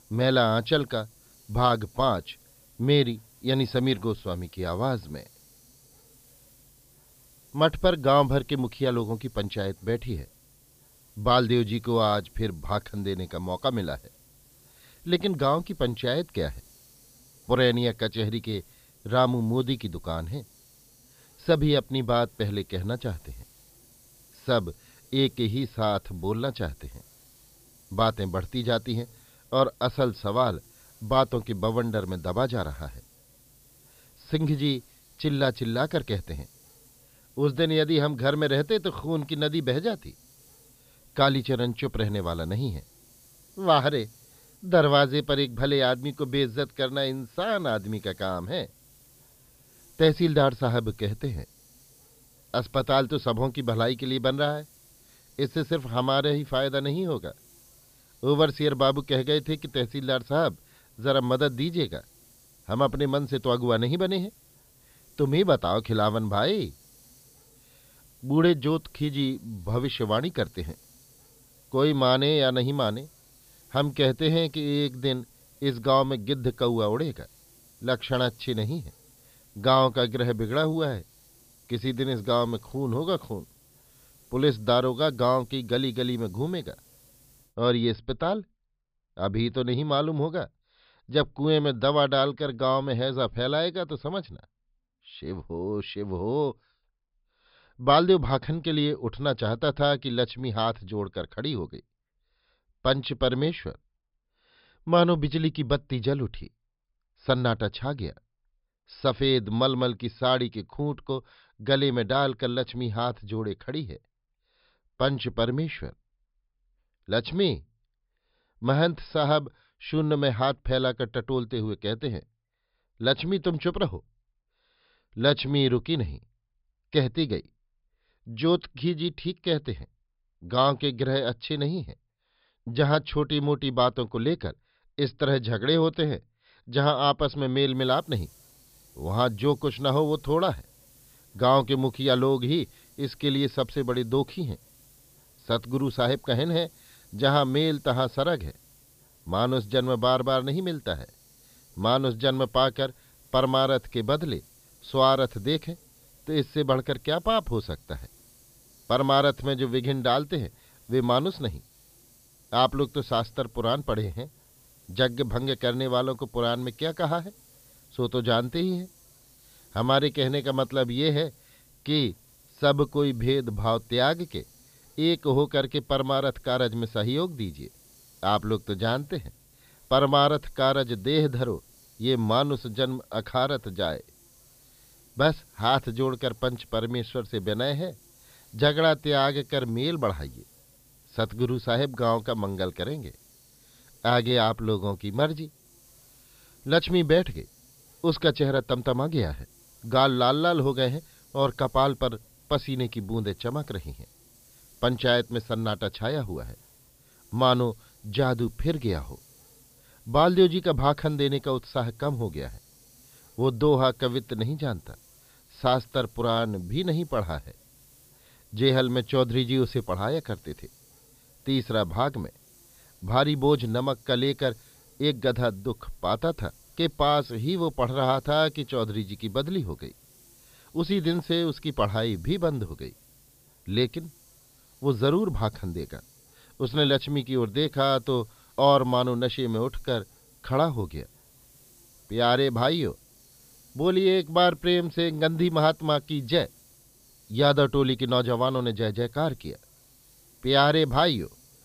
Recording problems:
high frequencies cut off; noticeable; nothing above 5.5 kHz
hiss; faint; until 1:27 and from 2:18 on; 30 dB below the speech

